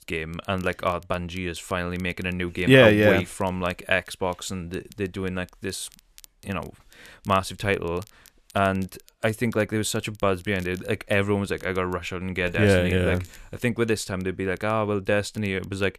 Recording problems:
crackle, like an old record; faint; 30 dB below the speech

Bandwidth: 14.5 kHz